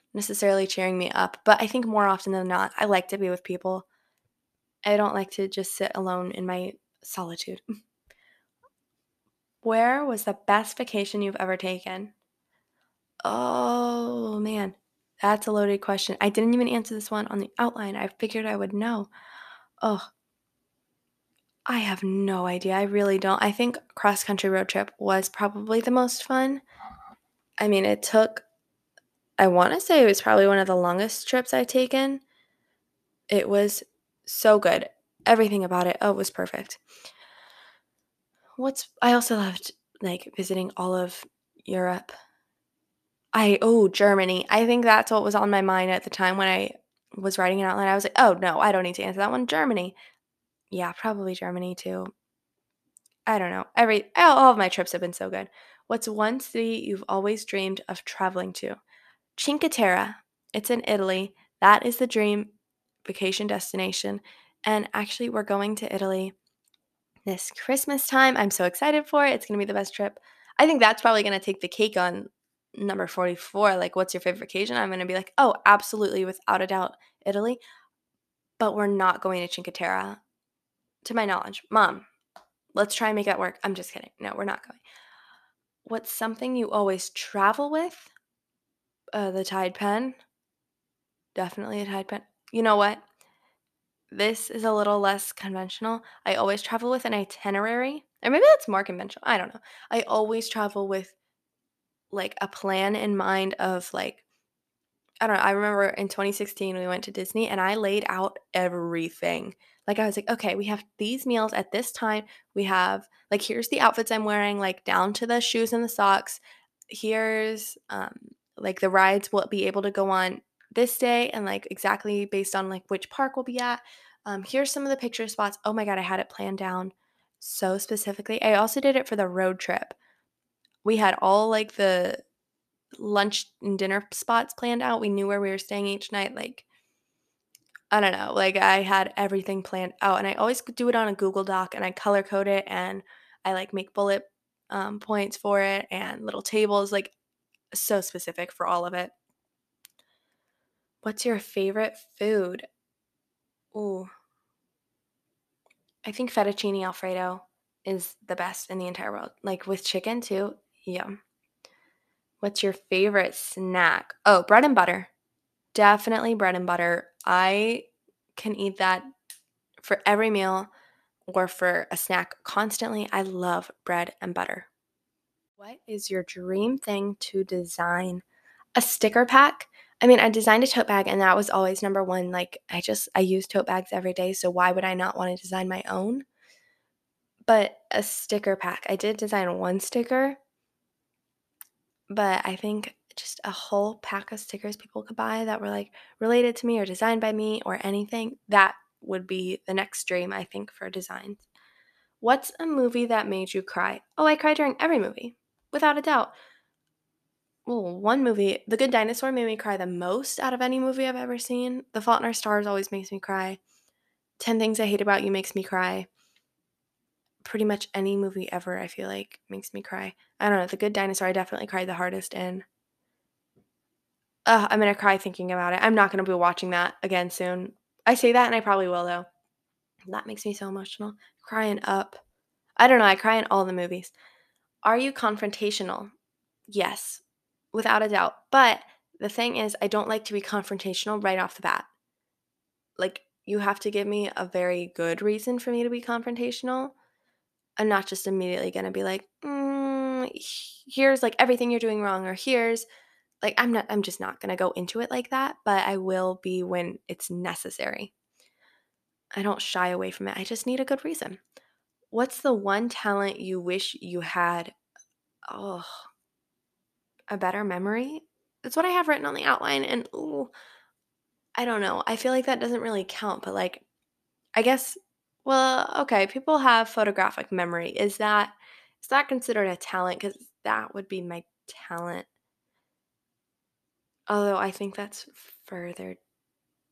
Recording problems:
none

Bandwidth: 14.5 kHz